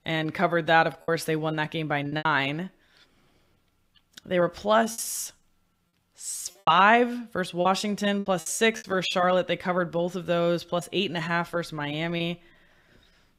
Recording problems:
choppy; very; 6% of the speech affected

